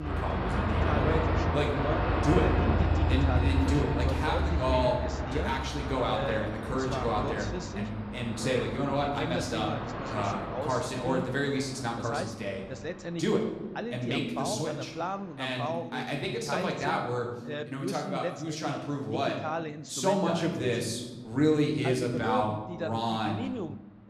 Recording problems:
room echo; noticeable; dies away in 1.1 s
off-mic speech; somewhat distant
train or aircraft noise; very loud; throughout; as loud as the speech
voice in the background; loud; throughout; 6 dB below the speech

